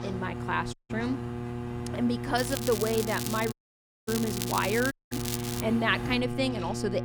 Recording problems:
crackling; loud; from 2.5 to 5.5 s; 6 dB below the speech
electrical hum; noticeable; throughout; 60 Hz, 10 dB below the speech
traffic noise; noticeable; throughout; 15 dB below the speech
household noises; faint; throughout; 25 dB below the speech
audio cutting out; at 0.5 s, at 3.5 s for 0.5 s and at 5 s

